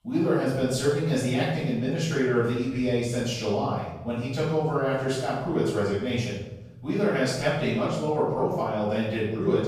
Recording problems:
room echo; strong; dies away in 1 s
off-mic speech; far

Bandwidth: 14.5 kHz